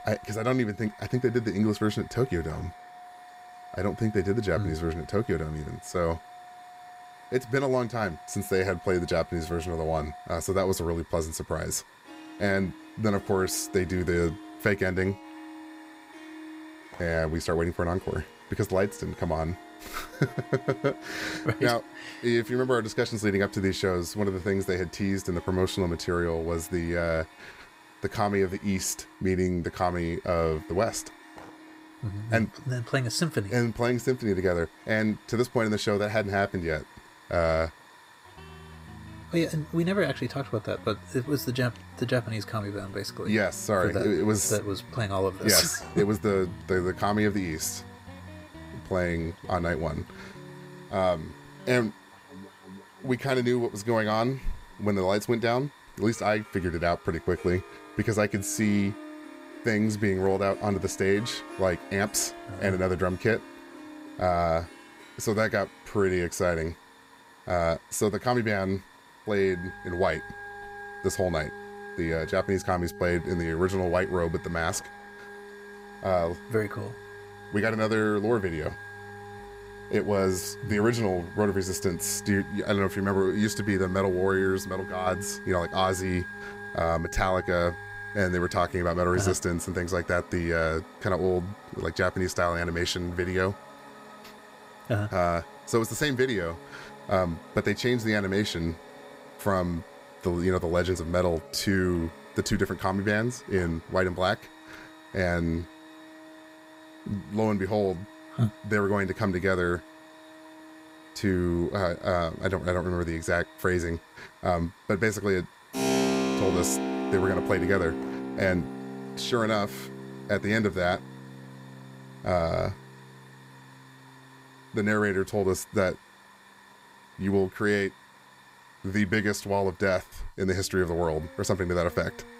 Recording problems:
background music; noticeable; throughout; 15 dB below the speech
hiss; faint; throughout; 25 dB below the speech

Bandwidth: 15.5 kHz